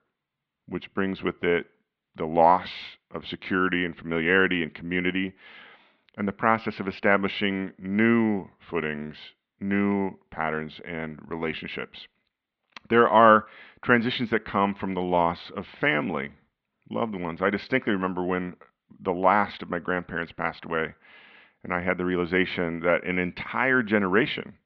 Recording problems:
muffled; slightly; fading above 3.5 kHz

